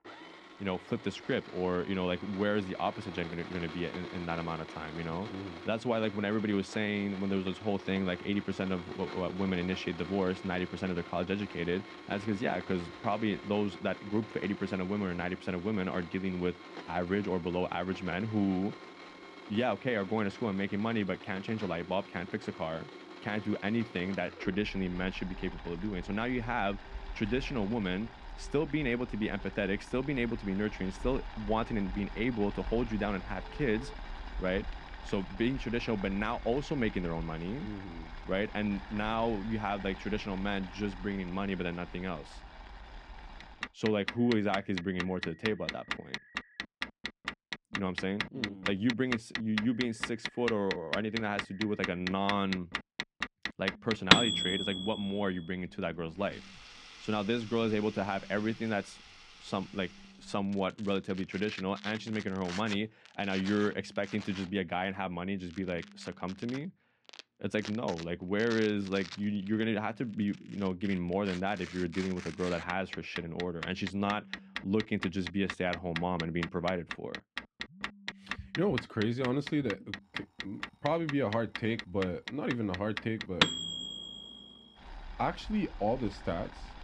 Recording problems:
muffled; slightly; fading above 2.5 kHz
household noises; loud; throughout; 7 dB below the speech
alarms or sirens; faint; throughout; 25 dB below the speech

